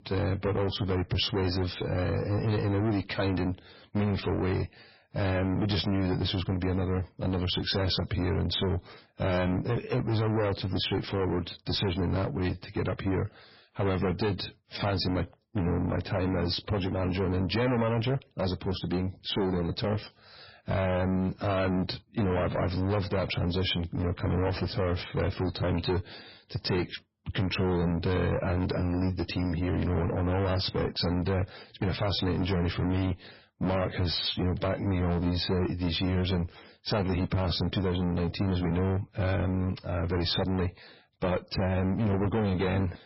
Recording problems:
distortion; heavy; 6 dB below the speech
garbled, watery; badly; nothing above 5.5 kHz

